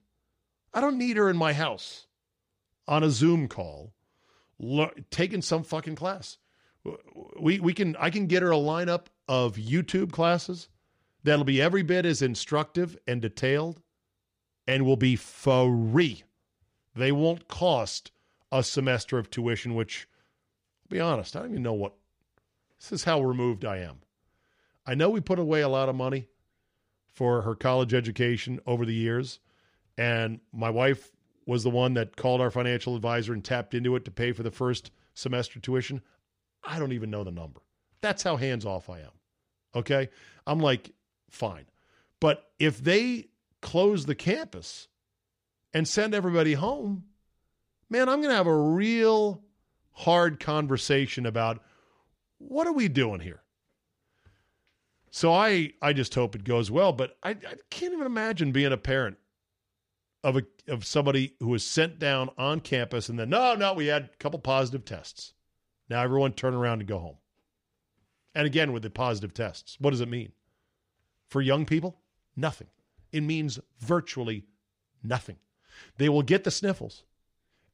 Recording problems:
none

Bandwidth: 15 kHz